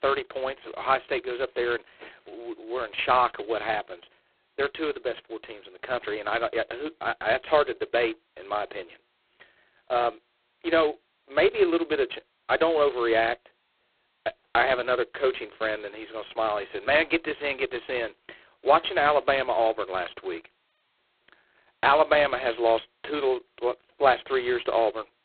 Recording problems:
phone-call audio; poor line; nothing above 4 kHz

